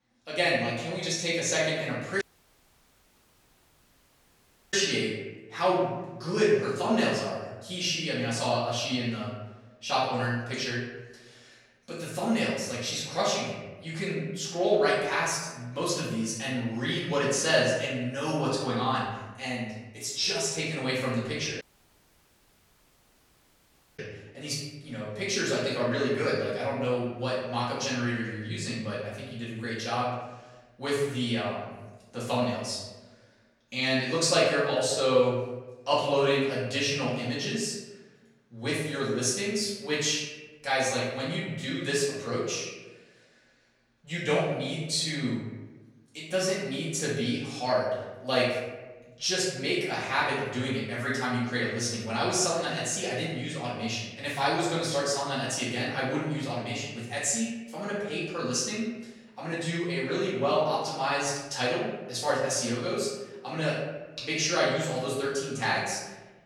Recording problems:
off-mic speech; far
room echo; noticeable; dies away in 1 s
audio cutting out; at 2 s for 2.5 s and at 22 s for 2.5 s

